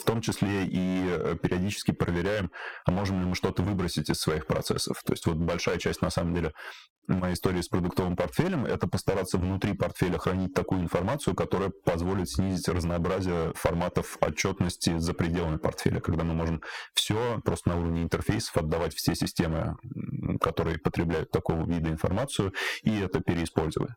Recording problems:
distortion; heavy; 11% of the sound clipped
squashed, flat; somewhat

